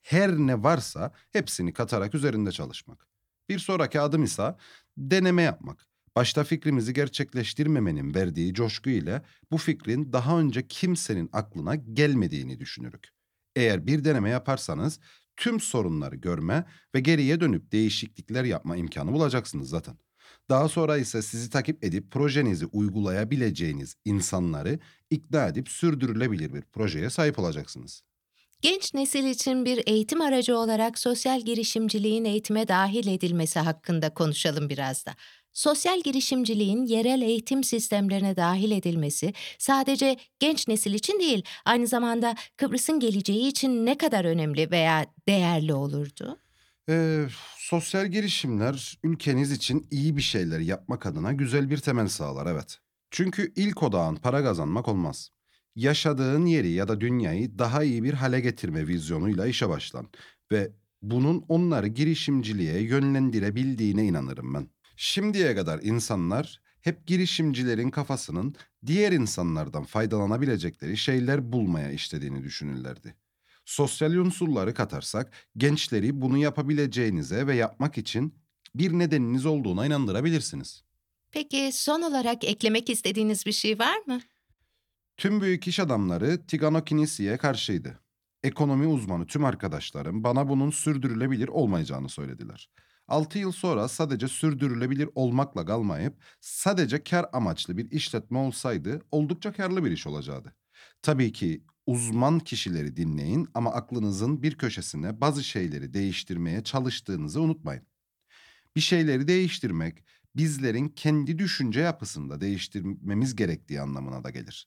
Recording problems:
none

